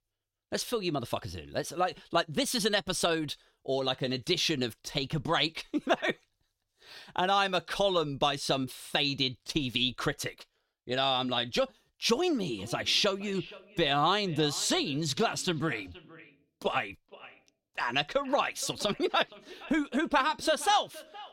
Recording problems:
echo of what is said; faint; from 13 s on; 470 ms later, 20 dB below the speech

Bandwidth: 16.5 kHz